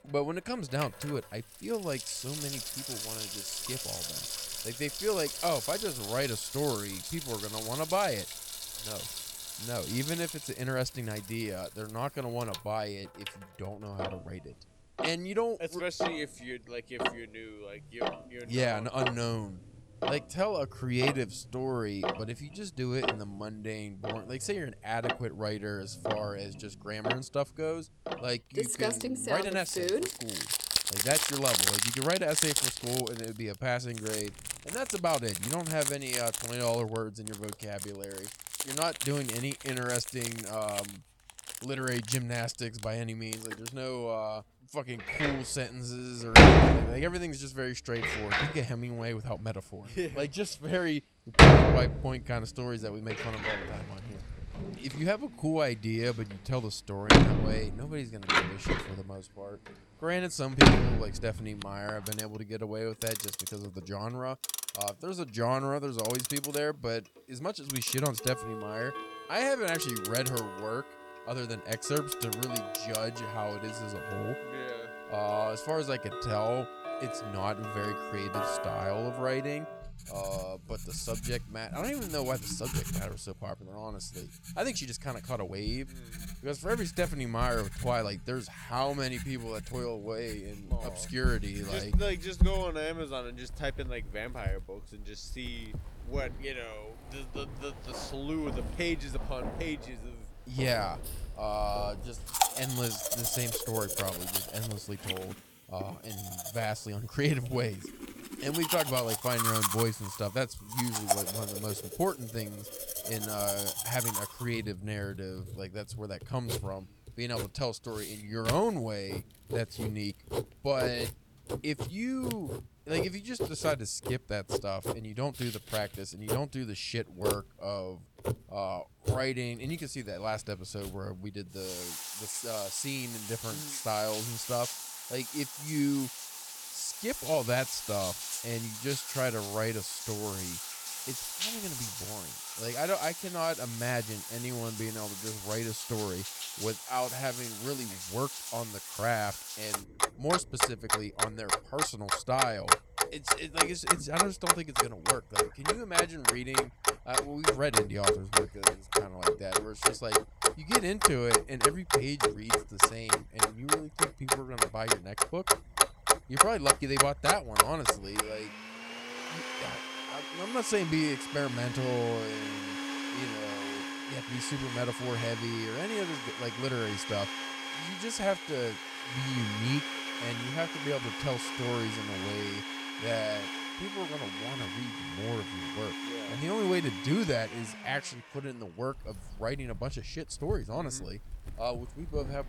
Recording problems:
household noises; very loud; throughout; 4 dB above the speech

